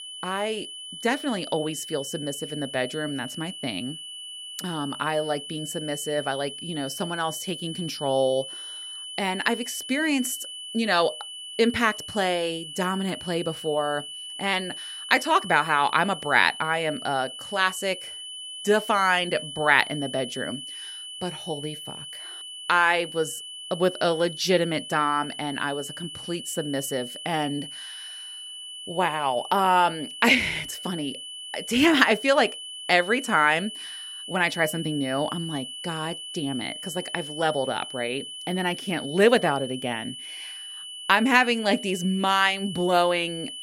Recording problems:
high-pitched whine; noticeable; throughout; 3 kHz, 10 dB below the speech

